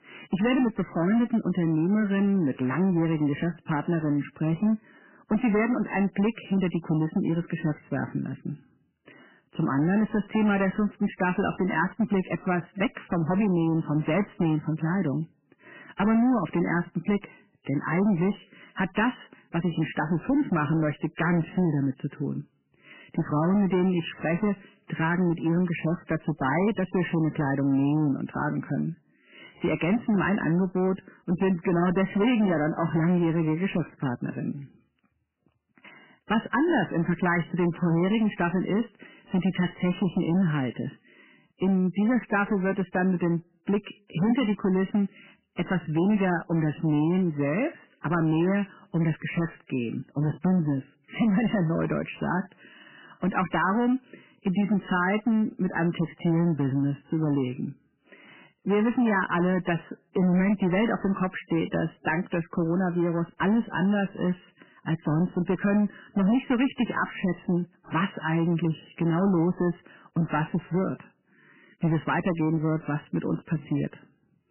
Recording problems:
garbled, watery; badly; nothing above 3 kHz
distortion; slight; 10% of the sound clipped

